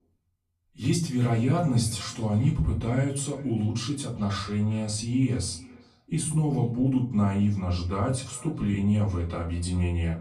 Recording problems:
off-mic speech; far
echo of what is said; faint; throughout; 400 ms later, 25 dB below the speech
room echo; slight; dies away in 0.3 s

